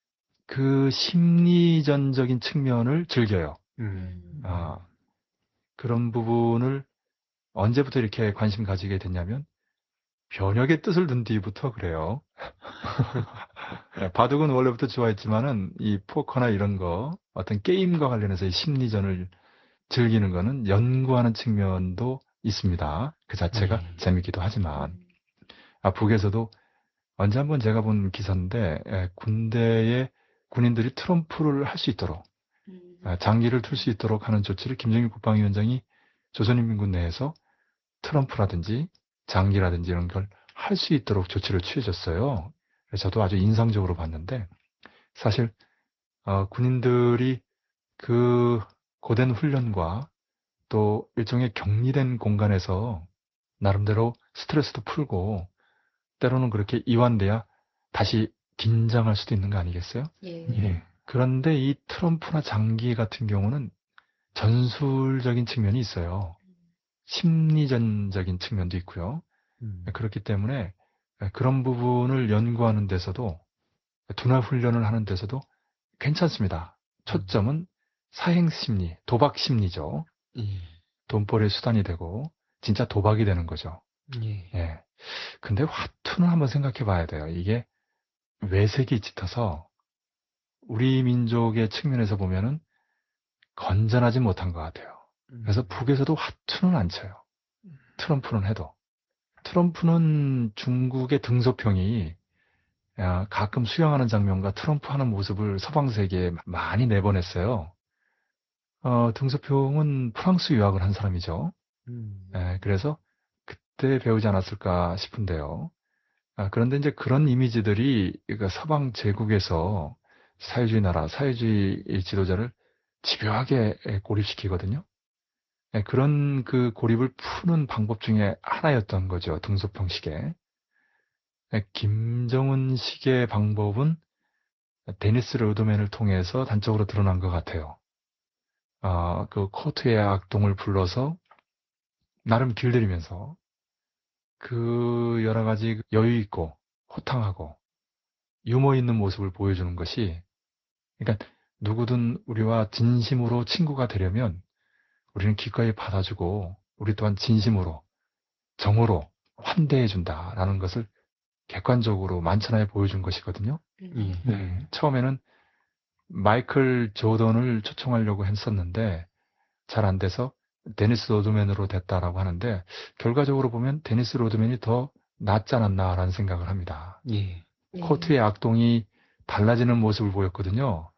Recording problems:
garbled, watery; slightly; nothing above 5.5 kHz

